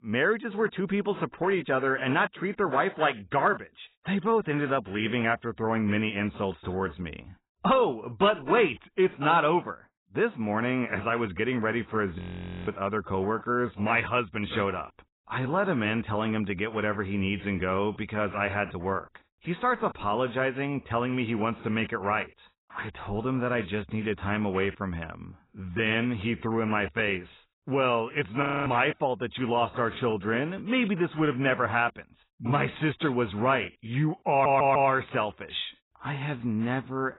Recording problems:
garbled, watery; badly; nothing above 4 kHz
audio freezing; at 12 s and at 28 s
audio stuttering; at 34 s

